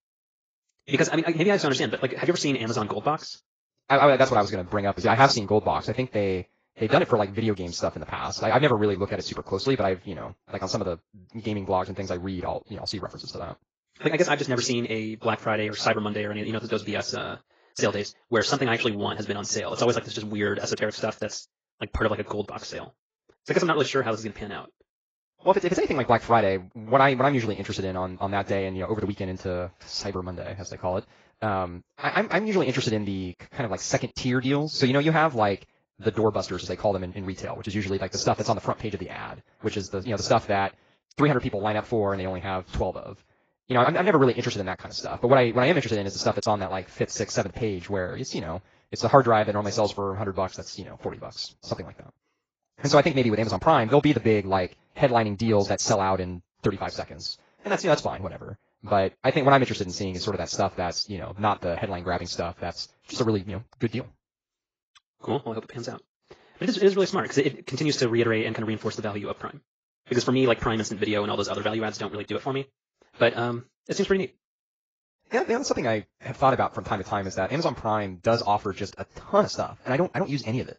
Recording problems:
garbled, watery; badly
wrong speed, natural pitch; too fast; 1.6 times normal speed

